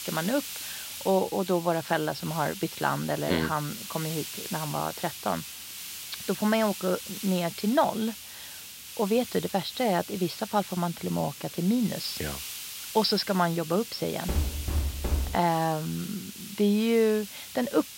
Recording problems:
high frequencies cut off; noticeable; nothing above 5.5 kHz
hiss; loud; throughout; 9 dB below the speech
door banging; noticeable; from 14 to 15 s; peak 2 dB below the speech

